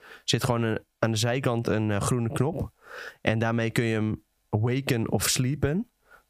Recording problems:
squashed, flat; heavily

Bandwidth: 15 kHz